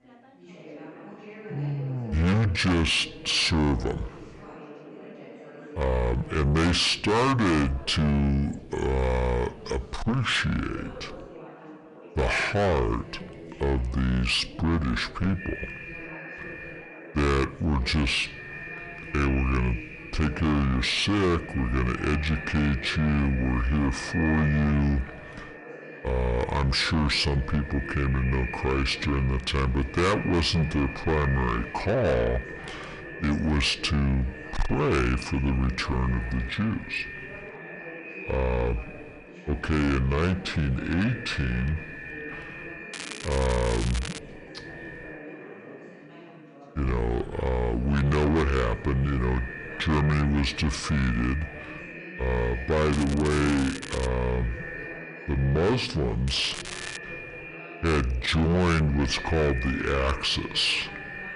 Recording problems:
distortion; heavy; 7 dB below the speech
wrong speed and pitch; too slow and too low; 0.7 times normal speed
echo of what is said; noticeable; from 15 s on; 320 ms later, 15 dB below the speech
background chatter; noticeable; throughout; 3 voices, 20 dB below the speech
crackling; noticeable; from 43 to 44 s, from 53 to 54 s and at 56 s; 10 dB below the speech

